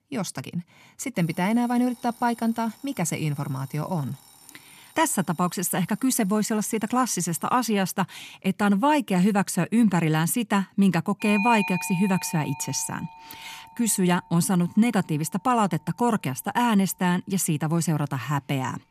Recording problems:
alarms or sirens; noticeable; throughout; 15 dB below the speech

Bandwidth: 14.5 kHz